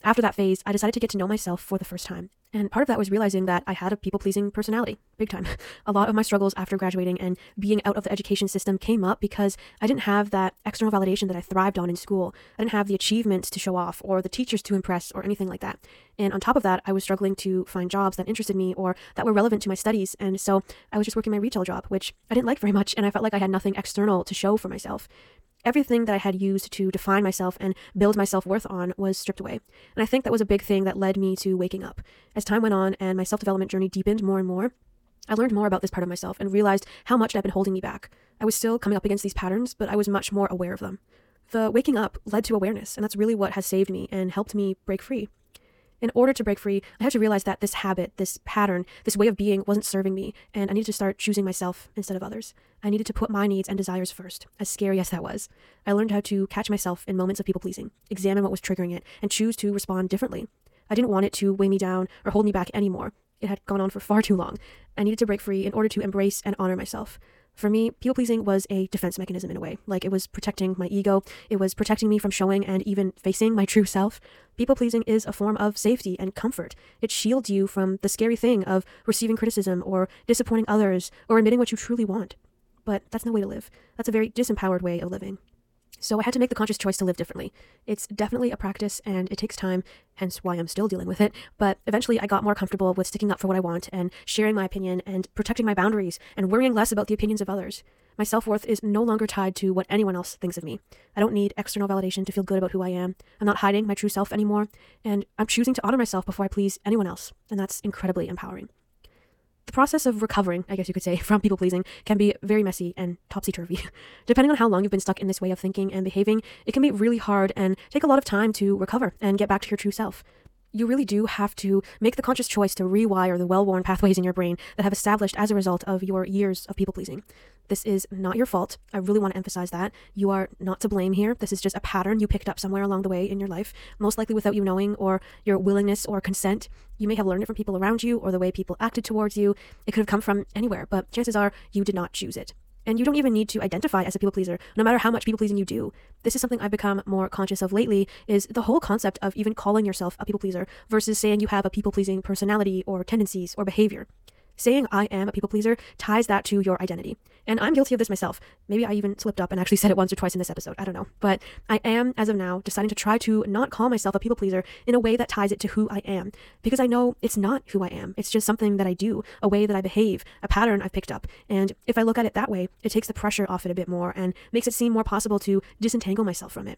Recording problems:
wrong speed, natural pitch; too fast; 1.7 times normal speed

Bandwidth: 17 kHz